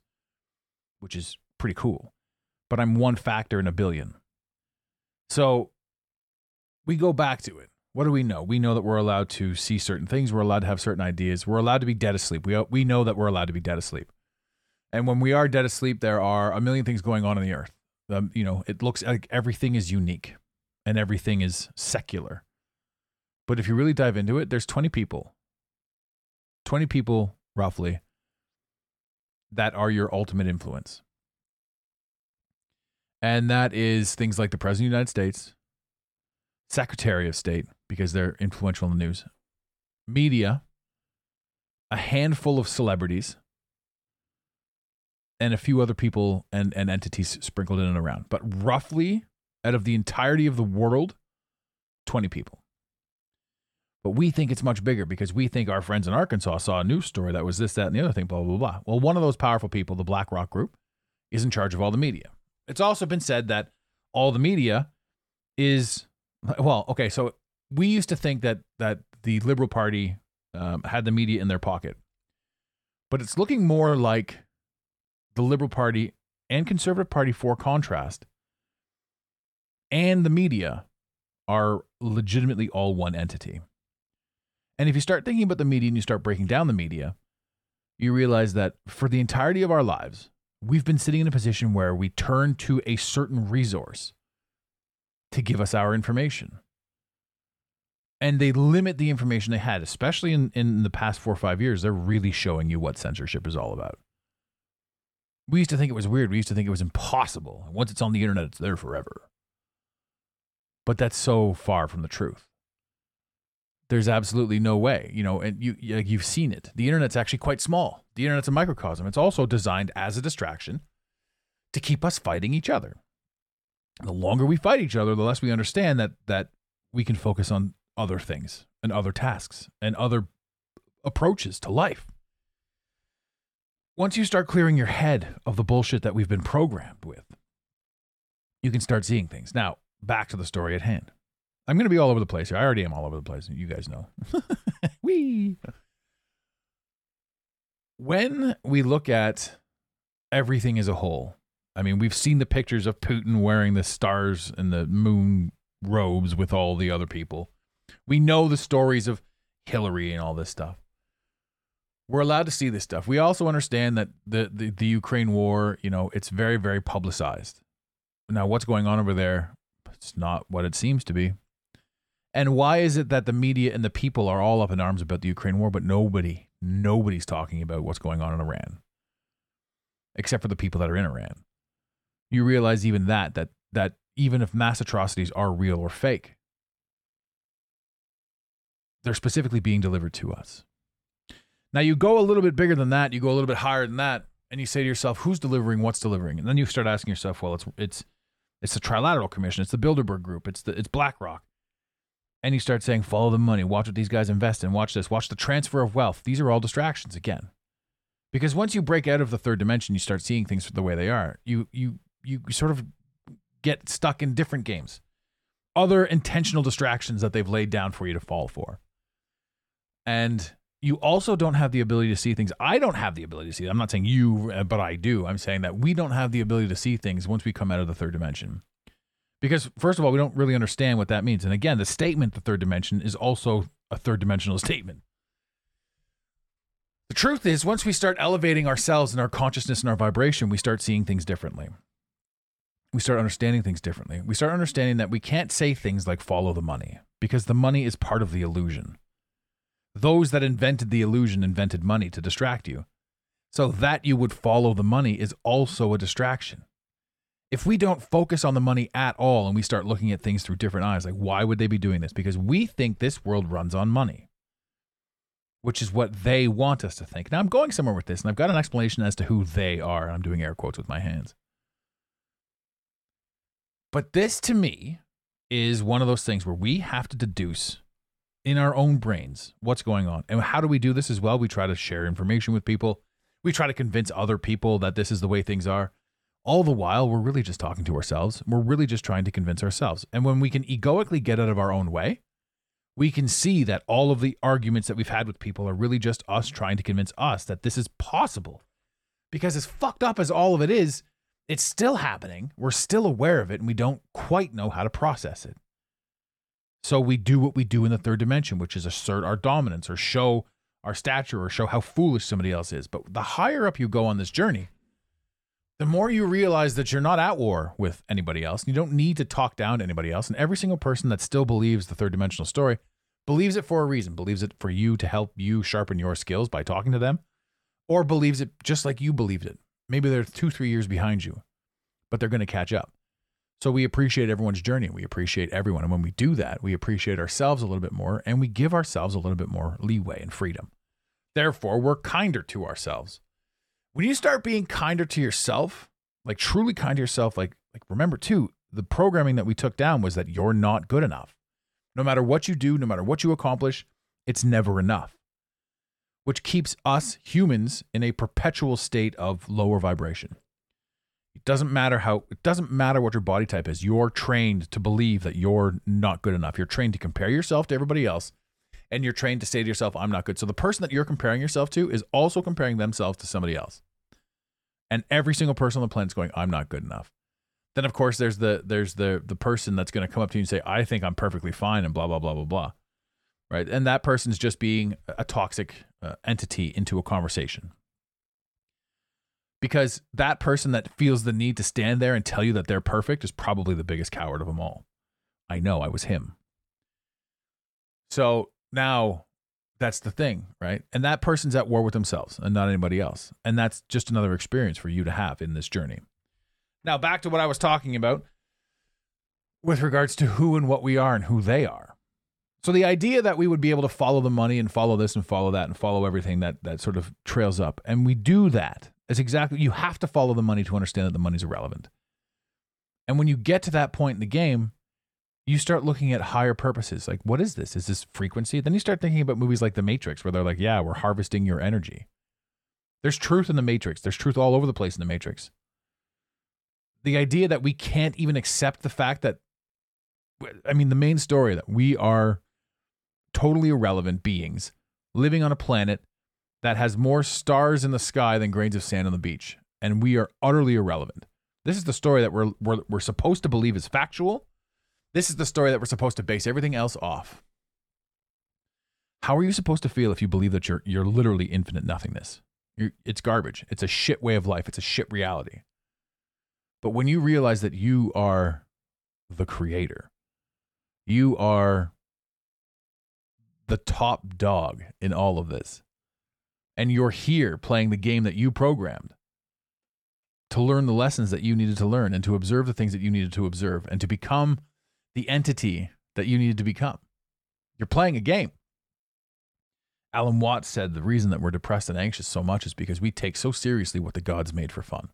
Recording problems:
none

